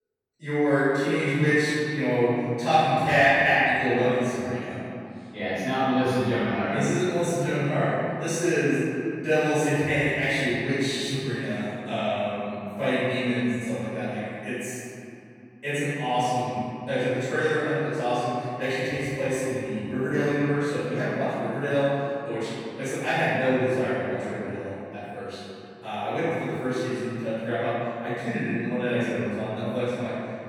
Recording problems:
room echo; strong; dies away in 2.8 s
off-mic speech; far

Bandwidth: 18.5 kHz